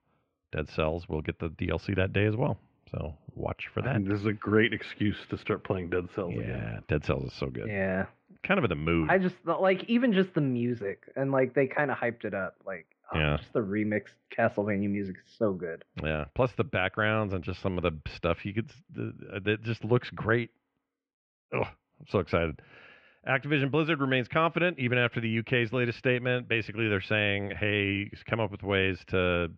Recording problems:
muffled; very; fading above 2.5 kHz

